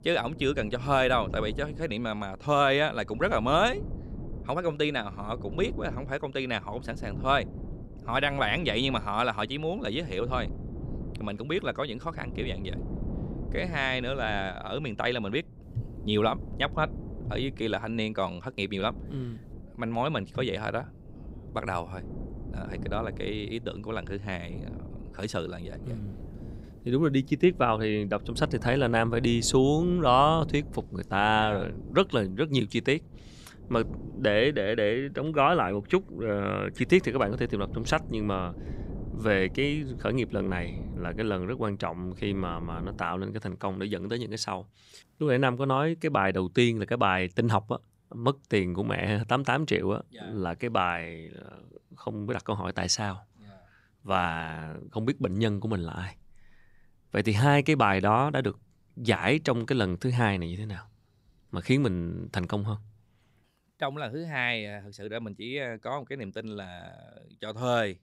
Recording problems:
wind noise on the microphone; occasional gusts; until 43 s; 20 dB below the speech

